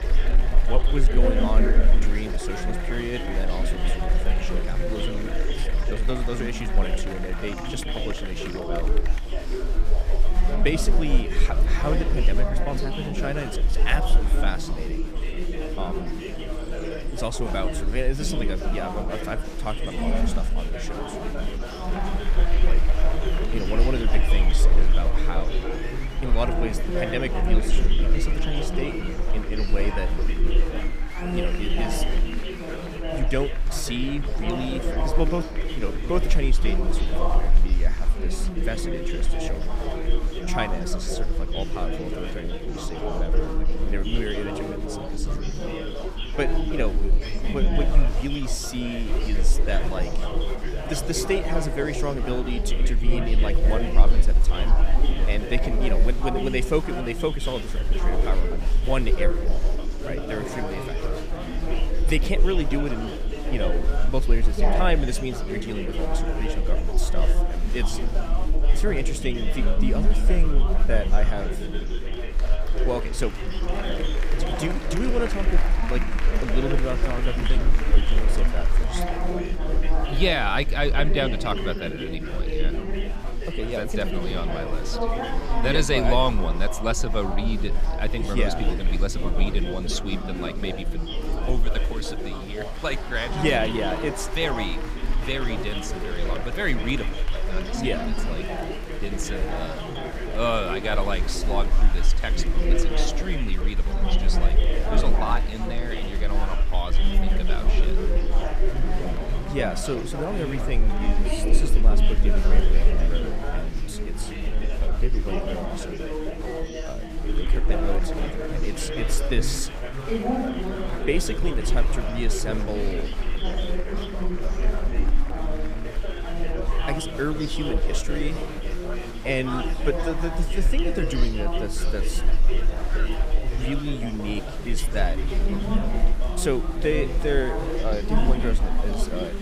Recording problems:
chatter from many people; loud; throughout; 2 dB below the speech
low rumble; faint; throughout; 25 dB below the speech

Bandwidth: 15 kHz